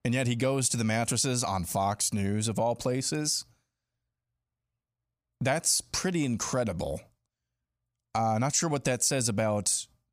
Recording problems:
none

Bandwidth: 15 kHz